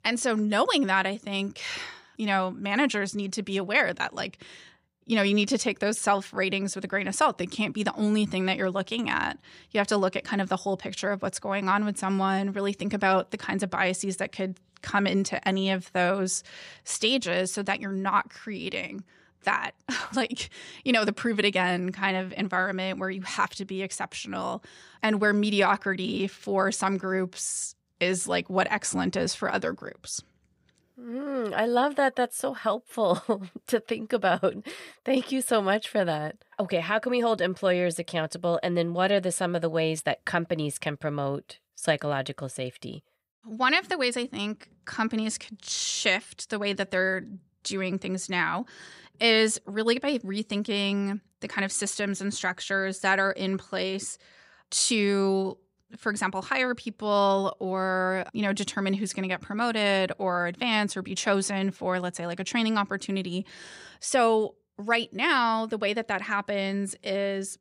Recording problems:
none

